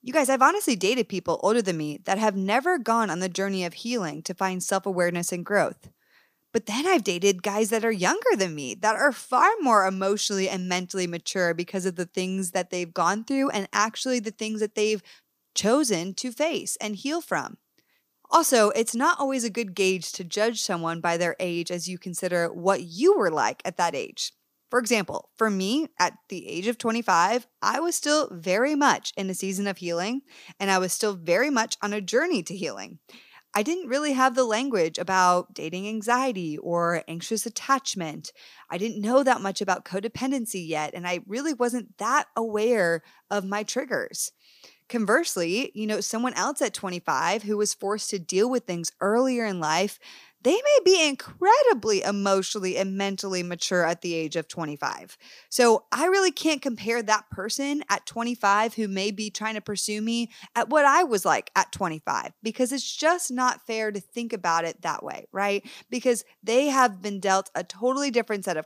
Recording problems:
none

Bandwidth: 15 kHz